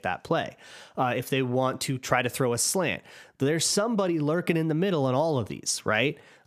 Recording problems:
squashed, flat; heavily

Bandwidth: 15 kHz